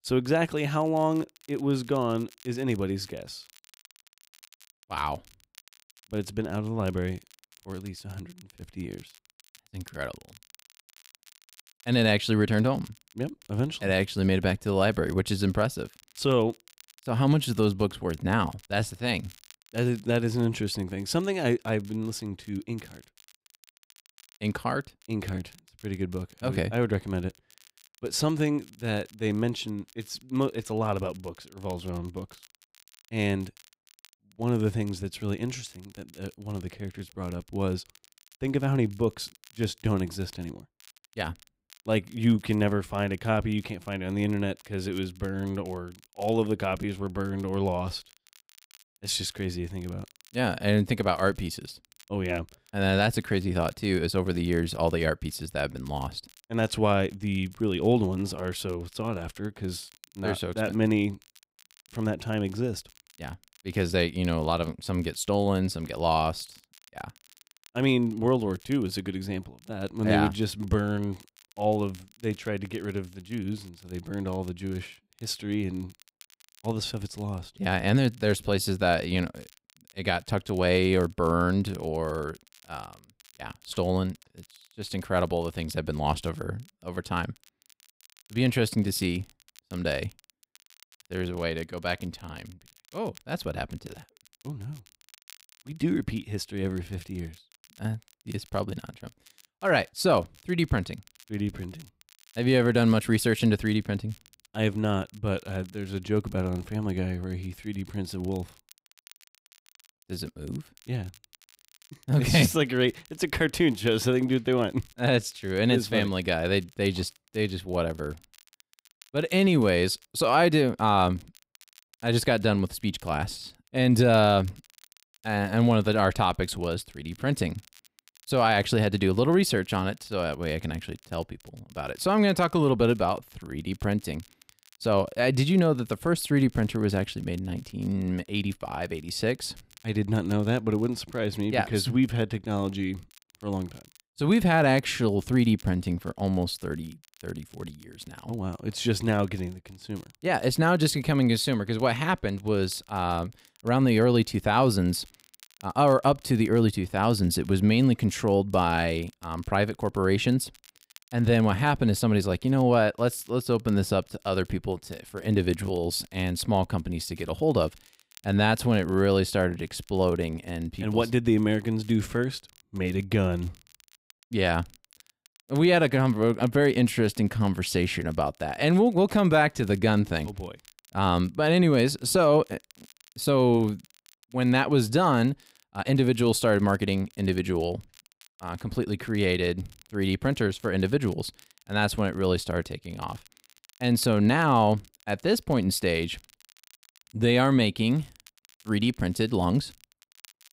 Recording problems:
crackle, like an old record; faint; 30 dB below the speech

